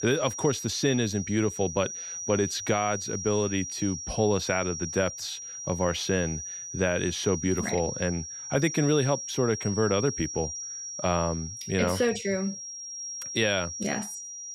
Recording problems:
high-pitched whine; loud; throughout; 5.5 kHz, 7 dB below the speech

